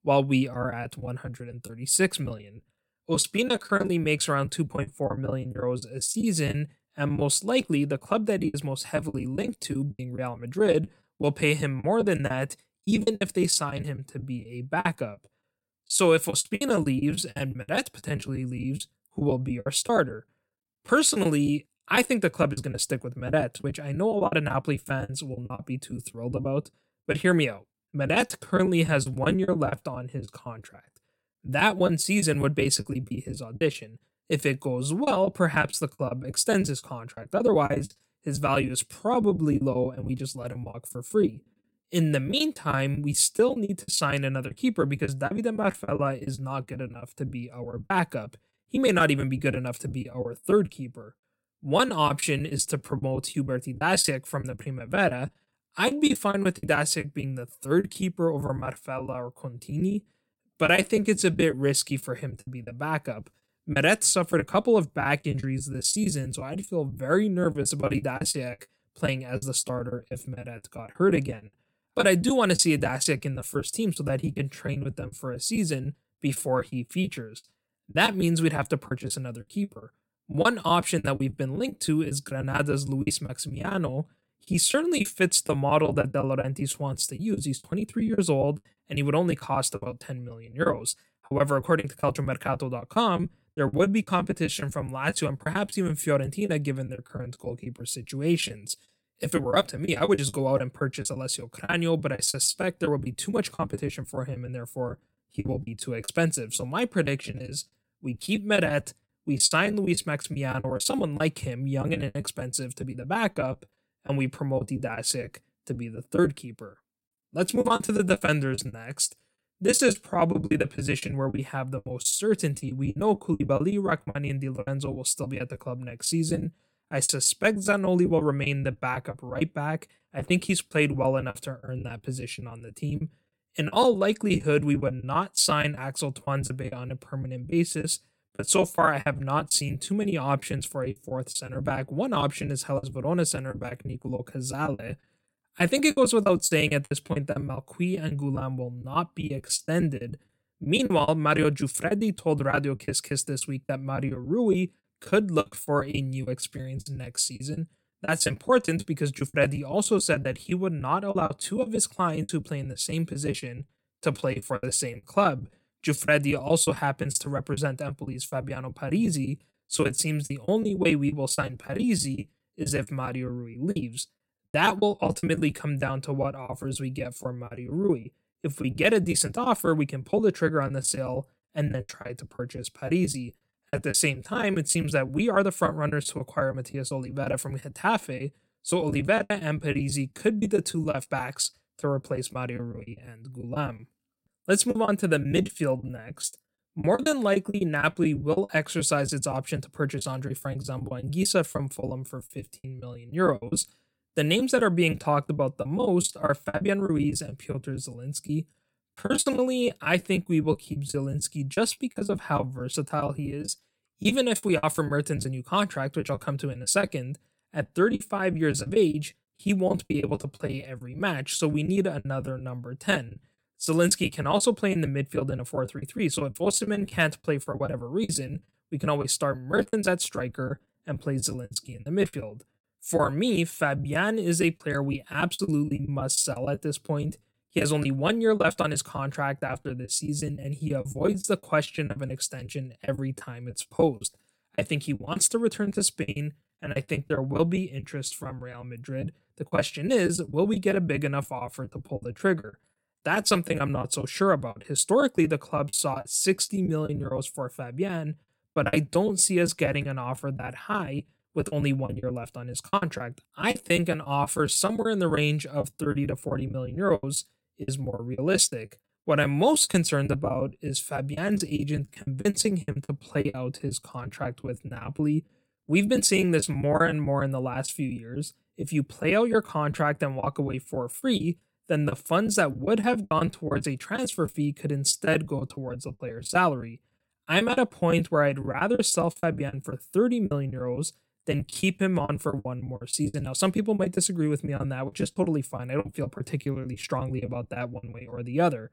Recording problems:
choppy; very; 15% of the speech affected

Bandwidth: 16.5 kHz